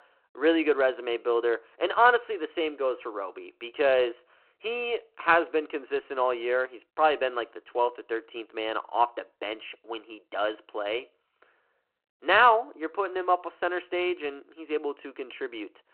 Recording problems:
phone-call audio; nothing above 4 kHz

